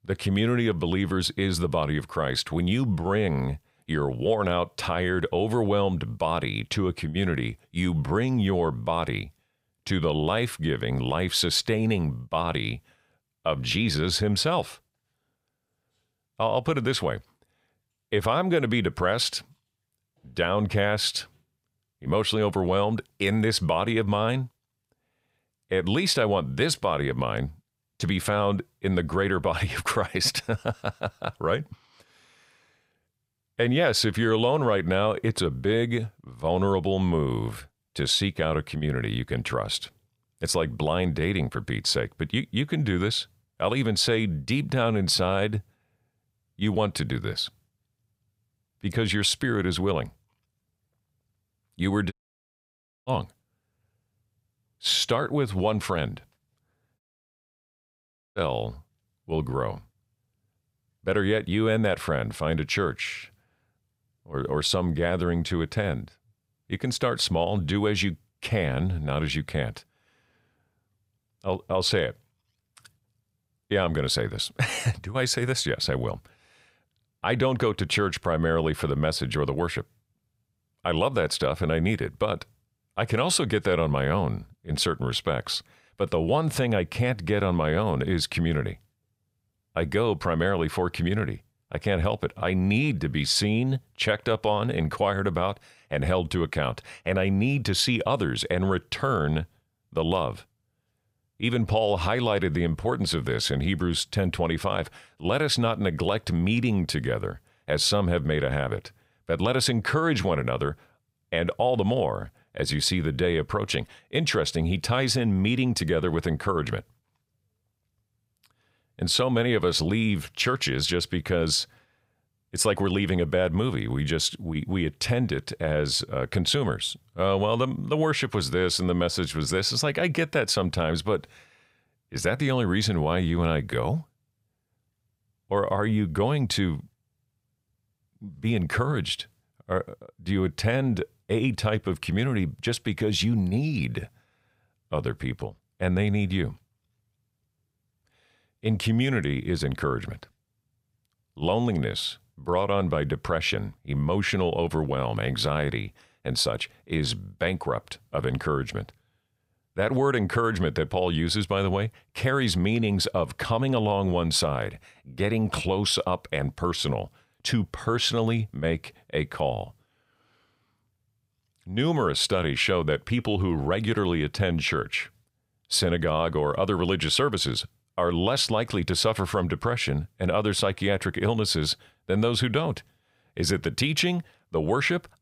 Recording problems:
audio cutting out; at 52 s for 1 s and at 57 s for 1.5 s

